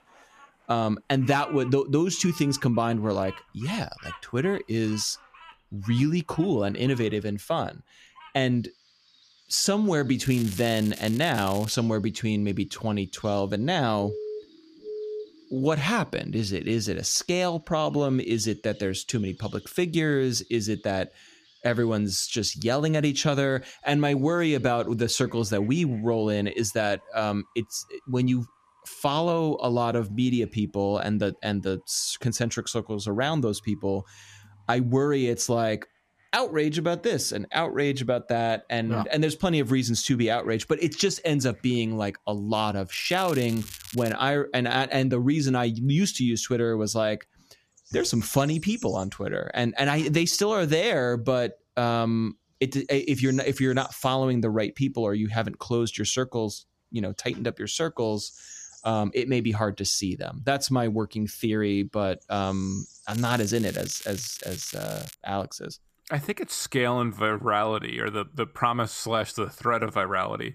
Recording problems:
crackling; noticeable; from 10 to 12 s, from 43 to 44 s and from 1:03 to 1:05; 15 dB below the speech
animal sounds; faint; throughout; 25 dB below the speech
siren; noticeable; from 14 to 16 s; peak 9 dB below the speech

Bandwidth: 14.5 kHz